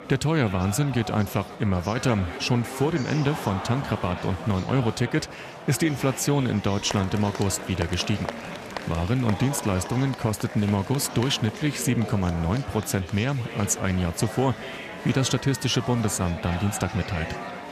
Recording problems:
chatter from many people; noticeable; throughout; 10 dB below the speech

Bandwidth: 14.5 kHz